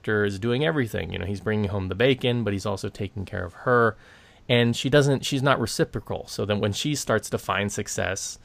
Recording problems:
none

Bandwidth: 15 kHz